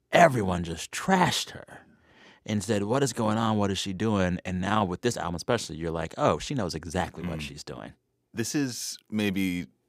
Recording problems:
none

